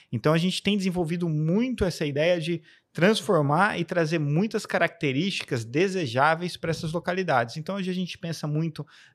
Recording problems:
none

